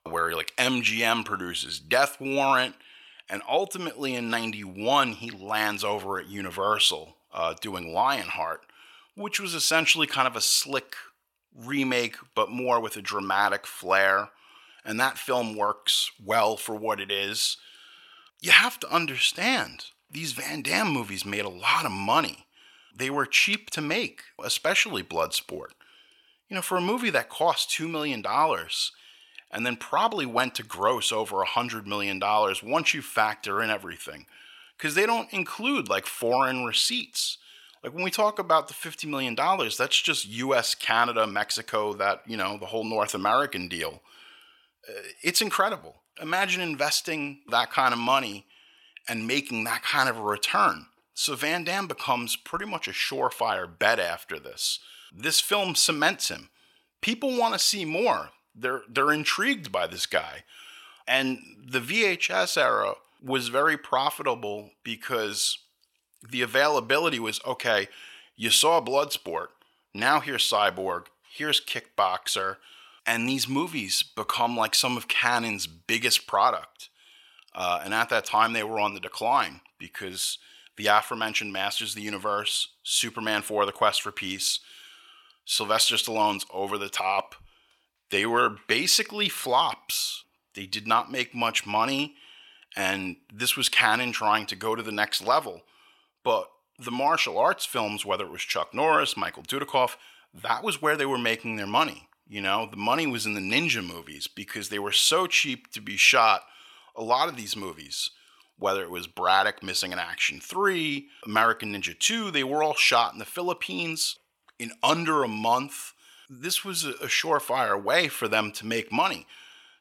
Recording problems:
thin; very slightly; fading below 950 Hz

